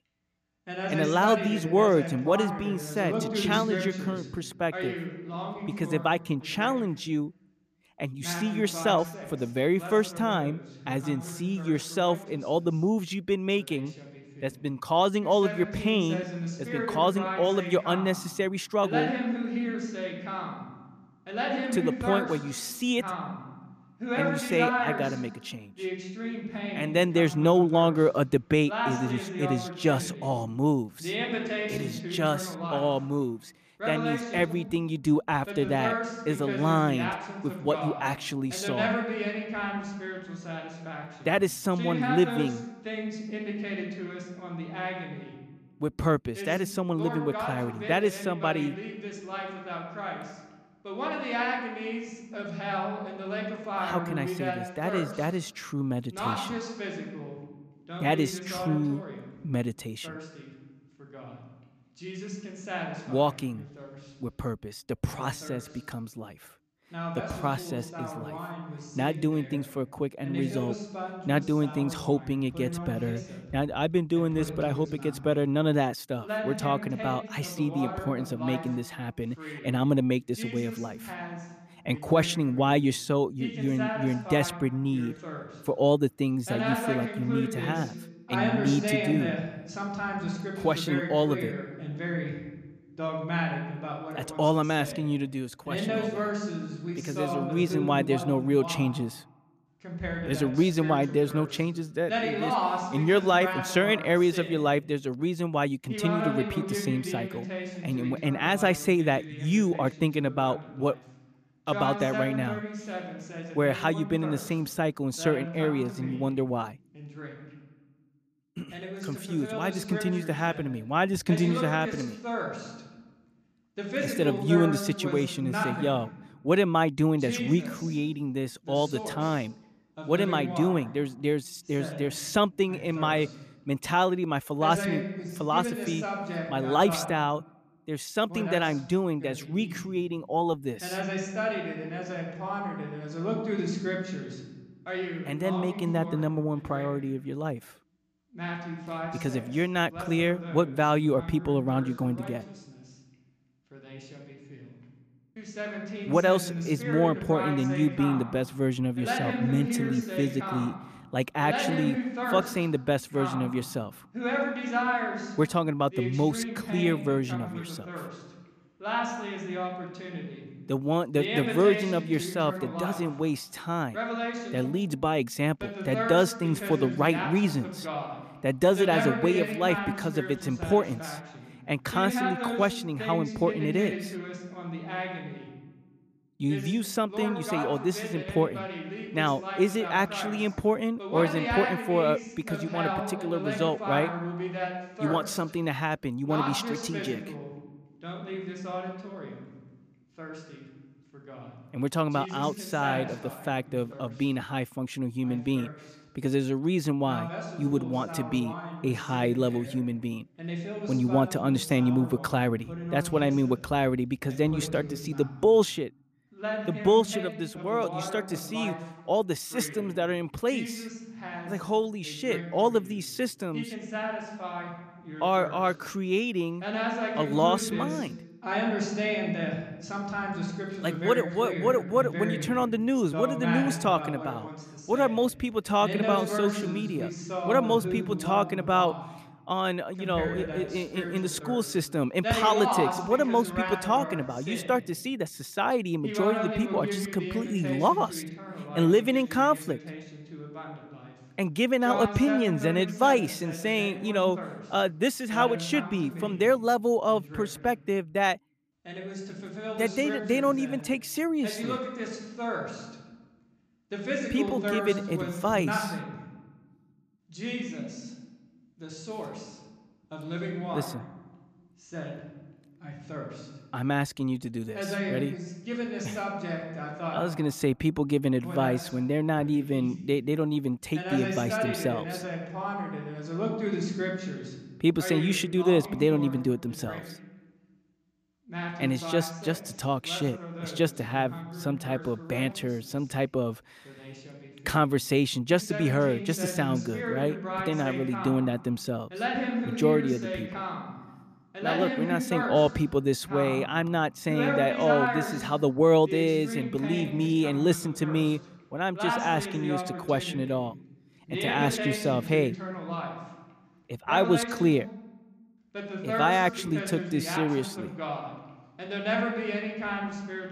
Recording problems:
voice in the background; loud; throughout; 7 dB below the speech

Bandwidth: 14.5 kHz